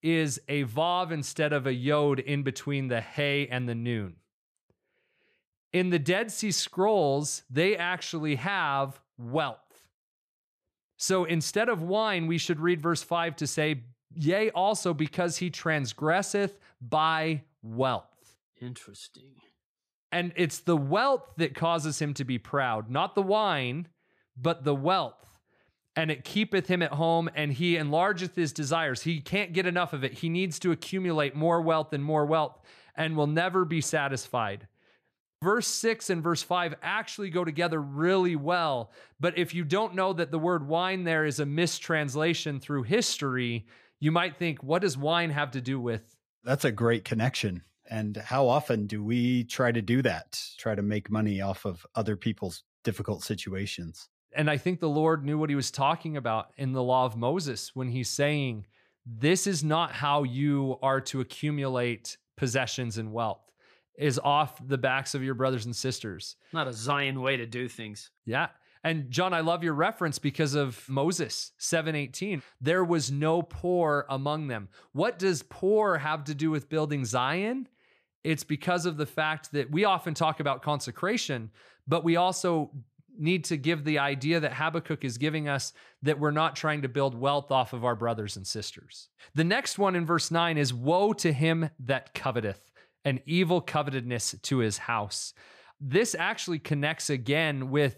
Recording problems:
none

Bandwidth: 14.5 kHz